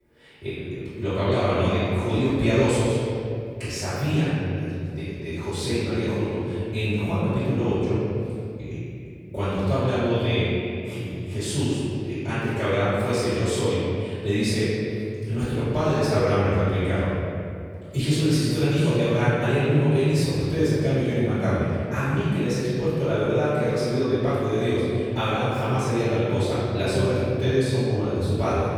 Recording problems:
room echo; strong; dies away in 2.5 s
off-mic speech; far

